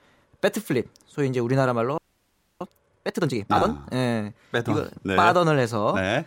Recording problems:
audio freezing; at 2 s for 0.5 s

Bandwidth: 16 kHz